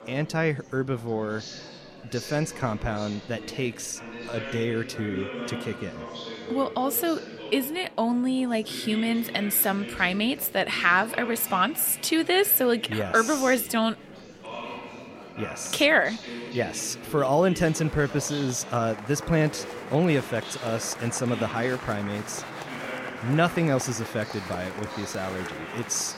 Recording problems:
murmuring crowd; noticeable; throughout; 10 dB below the speech

